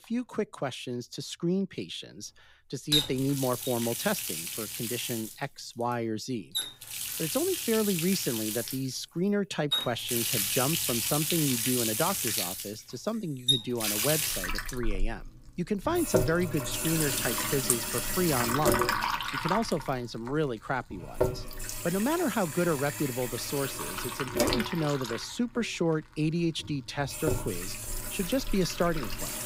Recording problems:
household noises; very loud; throughout; 1 dB above the speech

